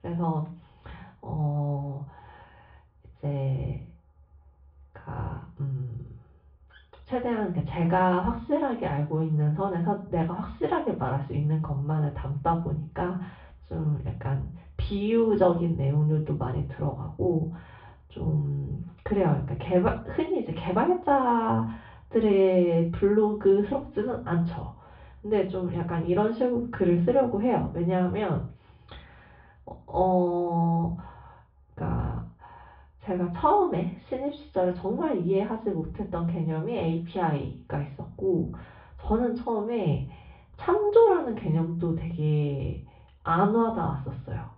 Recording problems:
off-mic speech; far
room echo; slight; dies away in 0.3 s
muffled; very slightly; fading above 3.5 kHz
high frequencies cut off; slight; nothing above 5.5 kHz

